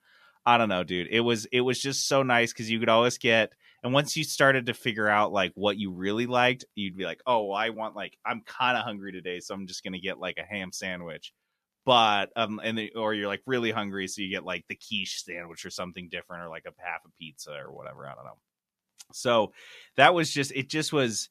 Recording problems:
none

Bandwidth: 14.5 kHz